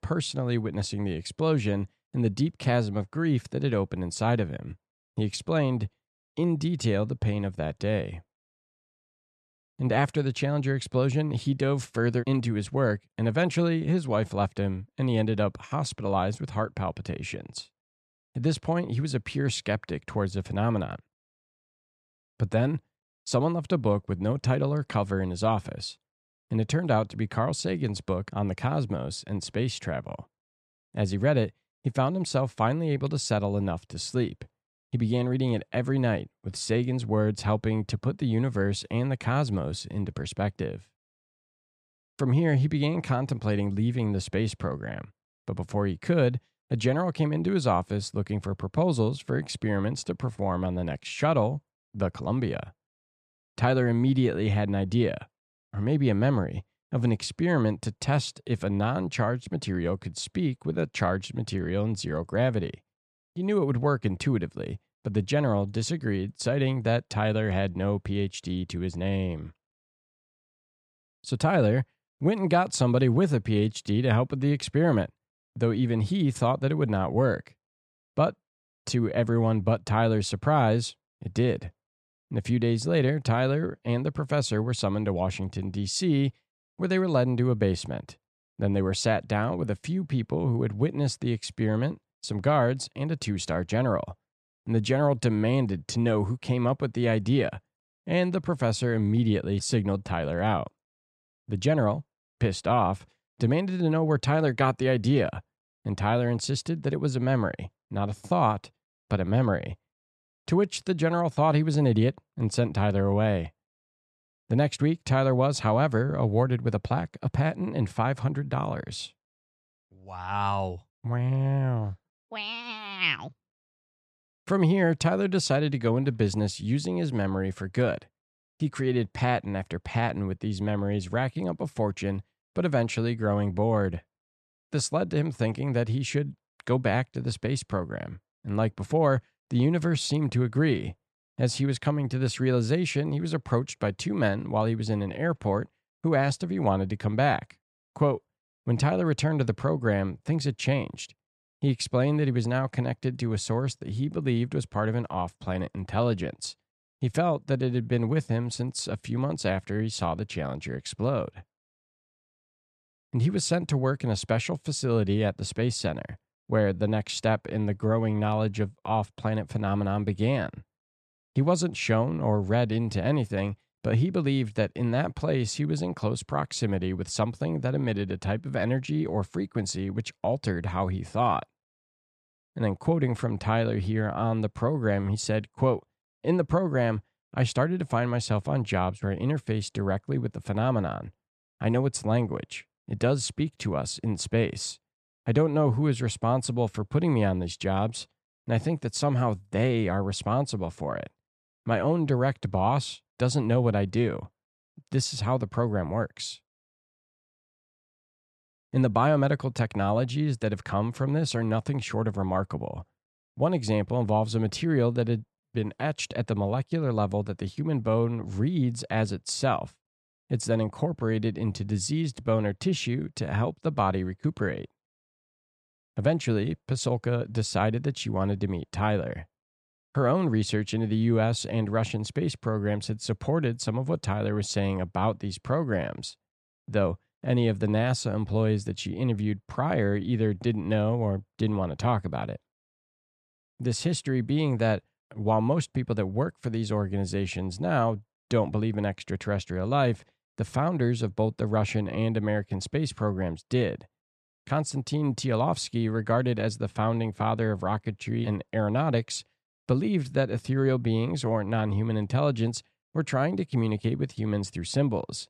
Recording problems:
none

